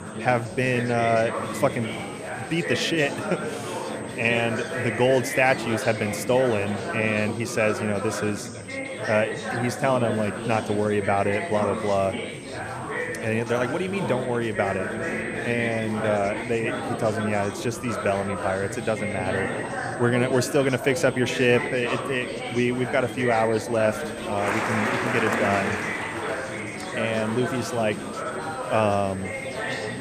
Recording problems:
chatter from many people; loud; throughout; 5 dB below the speech
high-pitched whine; faint; throughout; 8 kHz, 20 dB below the speech

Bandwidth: 14.5 kHz